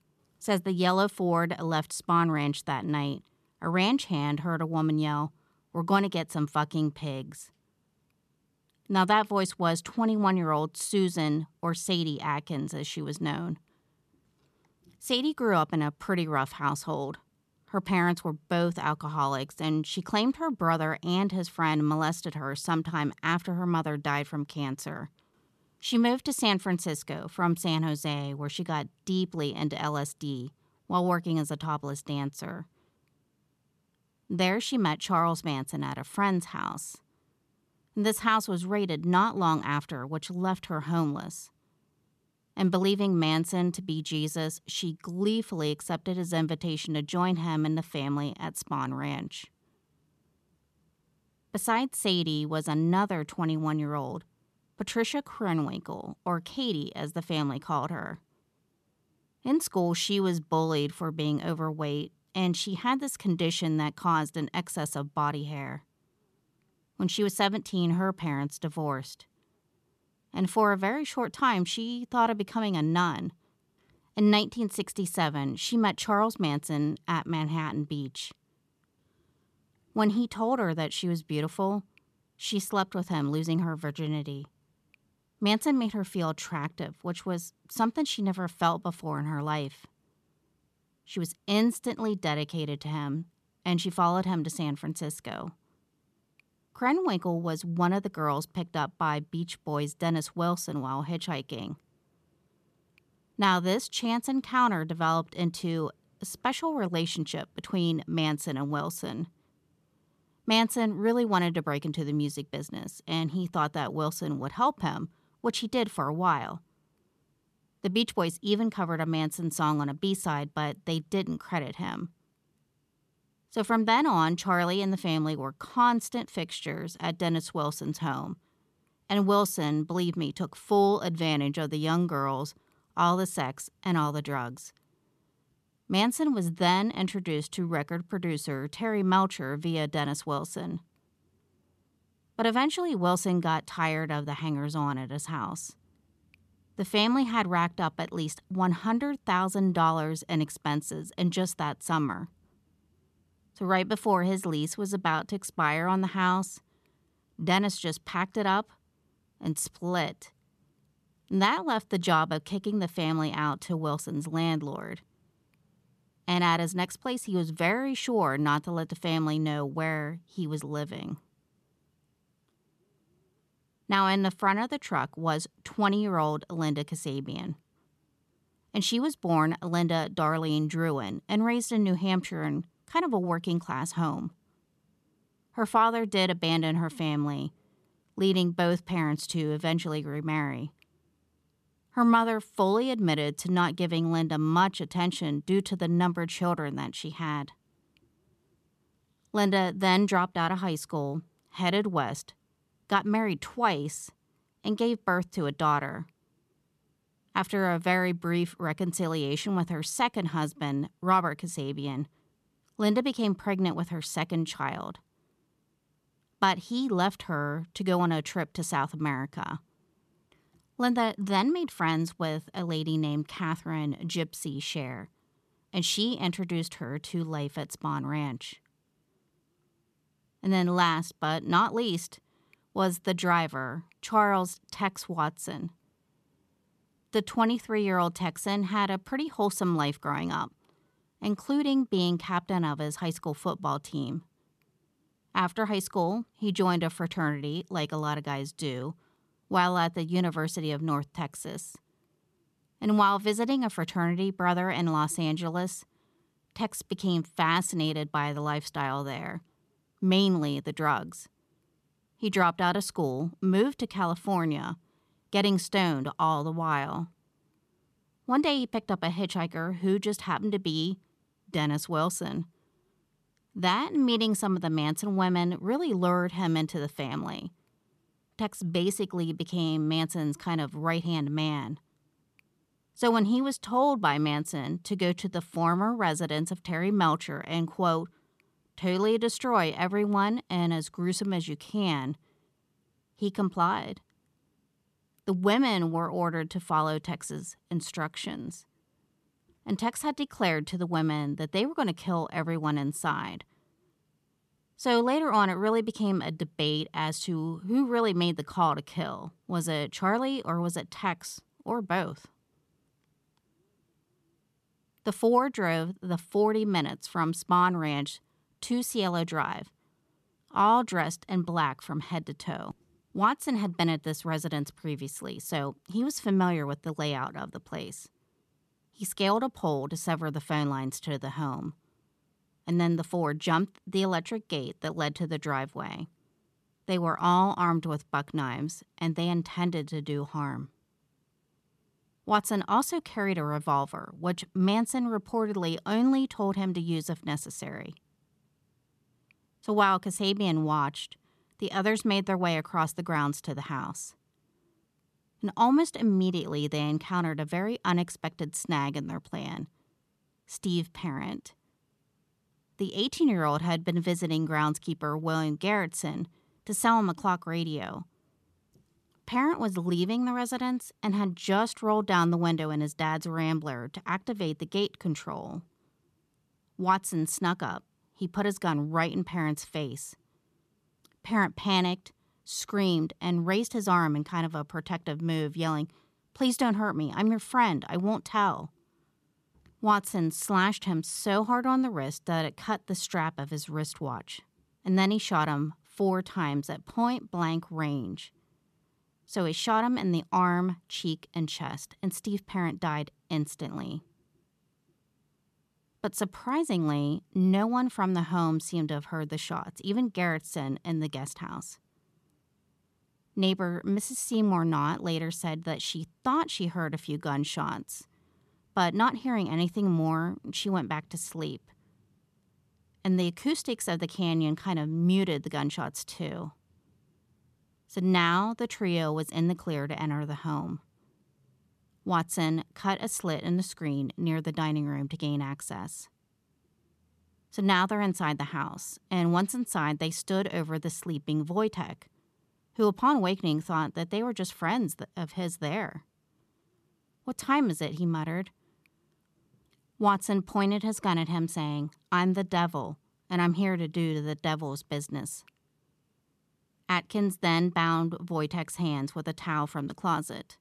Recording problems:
none

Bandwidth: 13.5 kHz